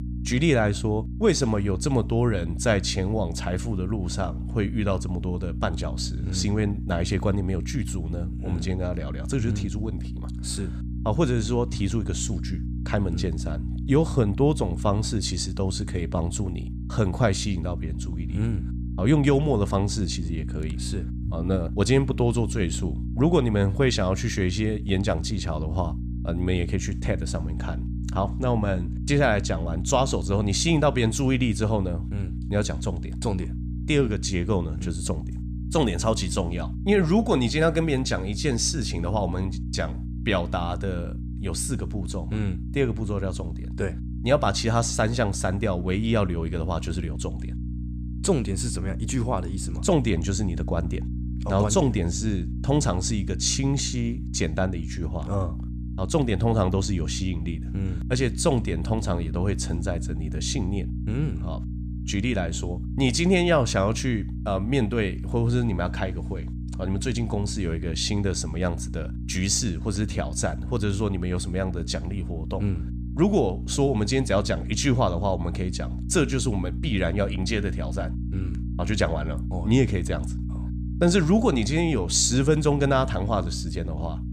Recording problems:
electrical hum; noticeable; throughout; 60 Hz, 15 dB below the speech

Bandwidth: 14.5 kHz